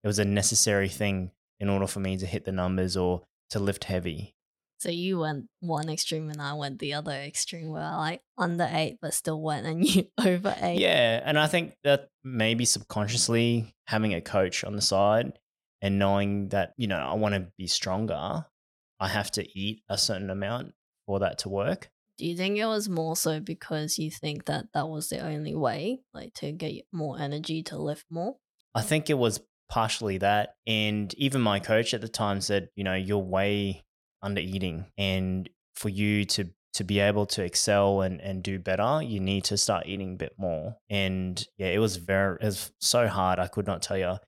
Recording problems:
none

